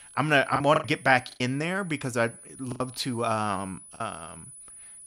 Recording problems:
high-pitched whine; noticeable; throughout; 10 kHz, 20 dB below the speech
choppy; very; at 0.5 s, at 2.5 s and at 4 s; 11% of the speech affected

